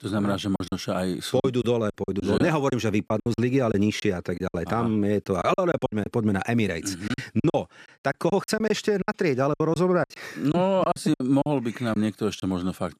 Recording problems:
choppy; very; 12% of the speech affected

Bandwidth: 14.5 kHz